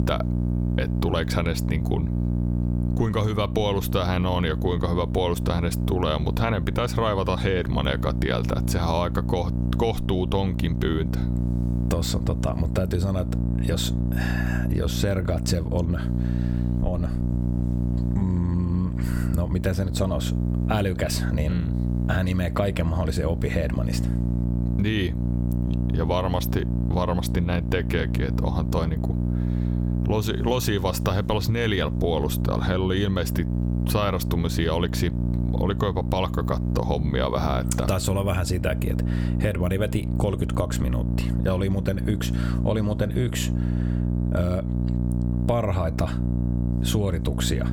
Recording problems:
squashed, flat; somewhat
electrical hum; loud; throughout; 60 Hz, 8 dB below the speech

